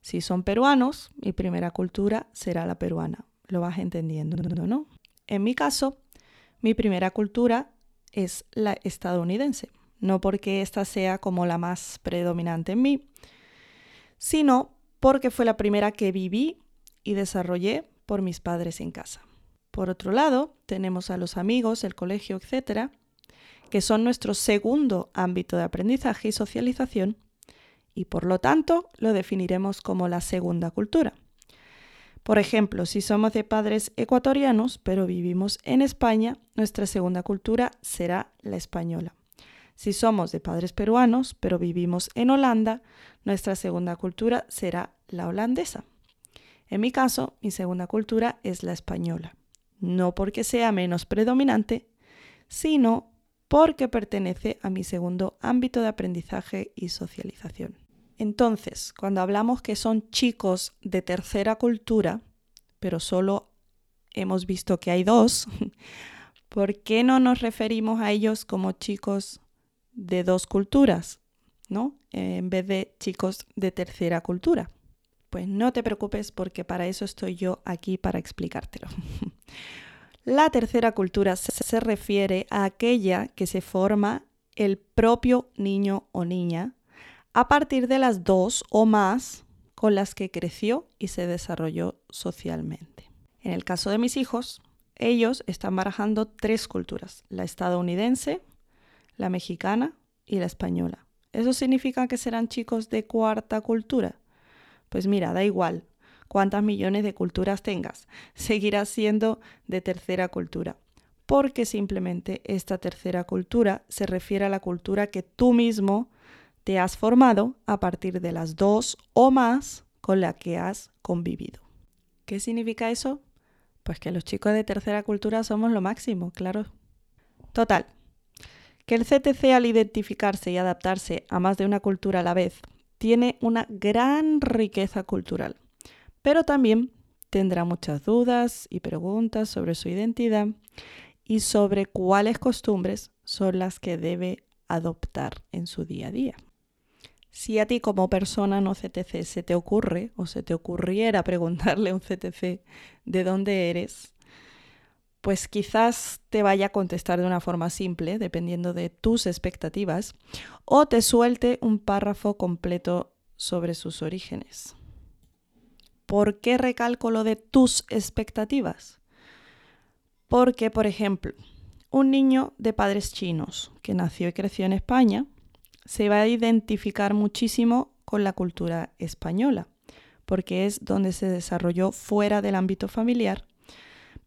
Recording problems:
audio stuttering; at 4.5 s and at 1:21

